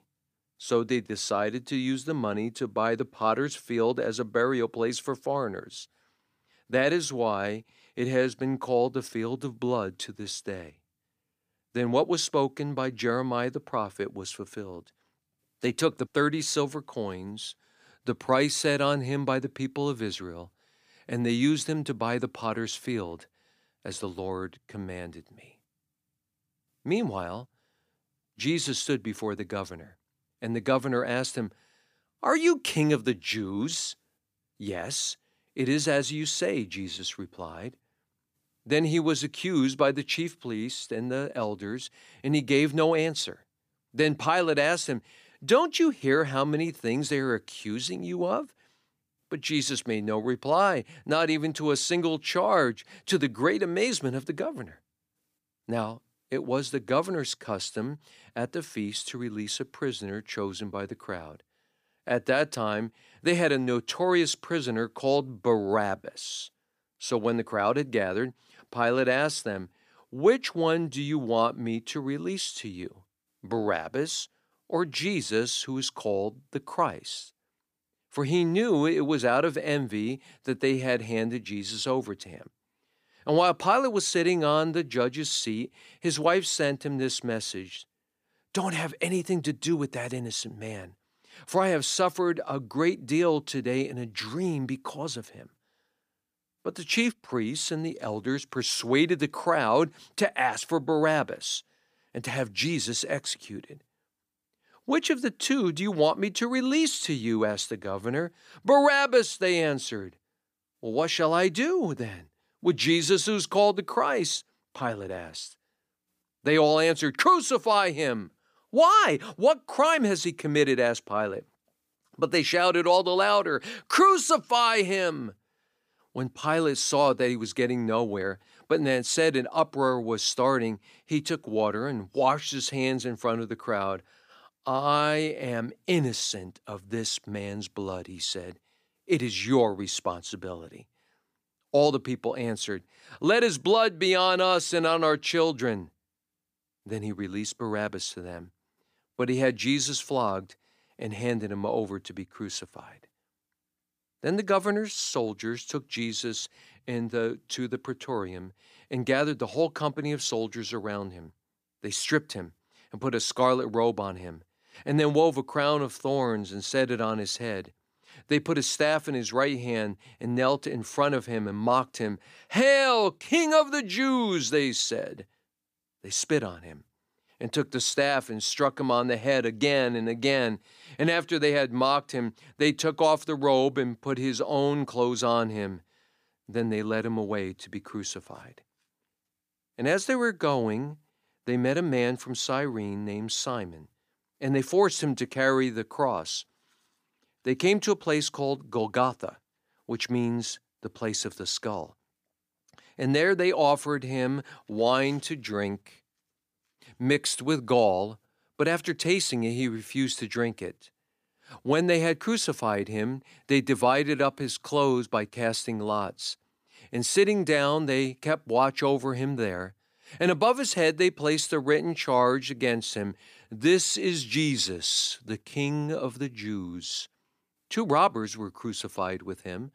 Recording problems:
none

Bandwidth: 15 kHz